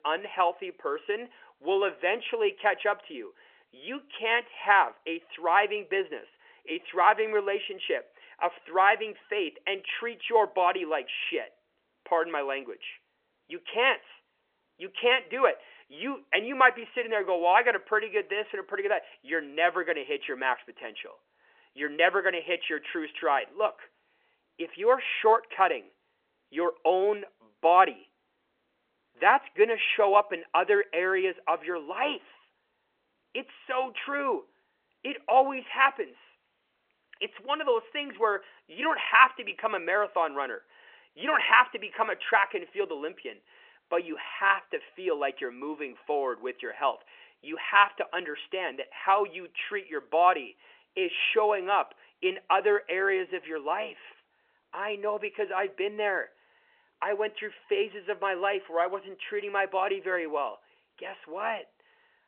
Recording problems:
phone-call audio; nothing above 3 kHz

